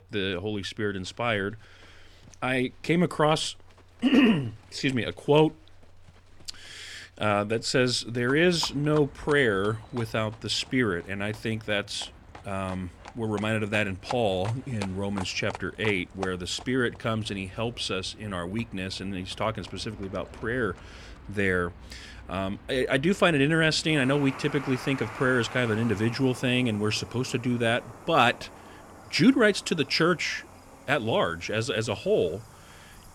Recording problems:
animal sounds; noticeable; throughout; 20 dB below the speech

